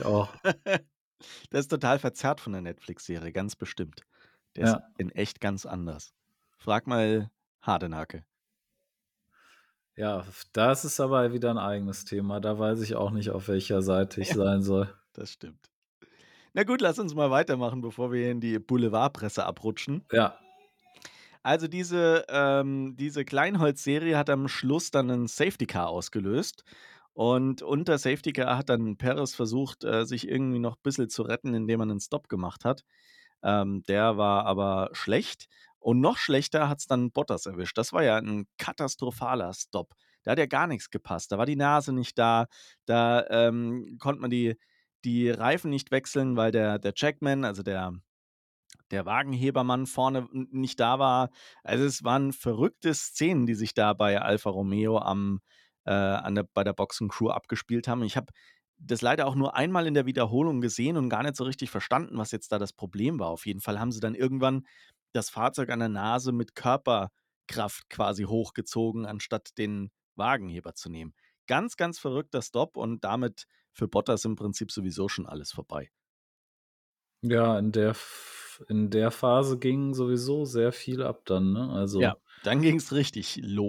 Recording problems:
abrupt cut into speech; at the start and the end

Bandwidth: 18 kHz